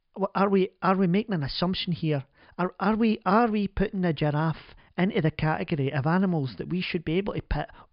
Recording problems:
high frequencies cut off; noticeable; nothing above 5 kHz

